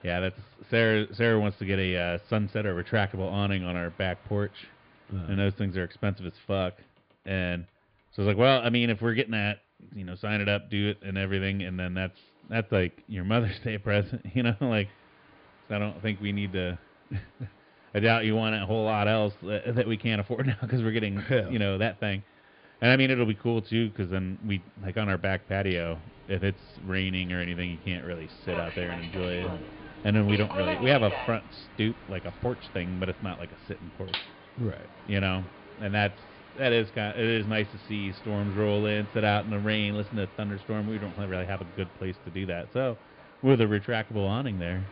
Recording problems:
high frequencies cut off; severe; nothing above 5 kHz
train or aircraft noise; noticeable; throughout; 15 dB below the speech

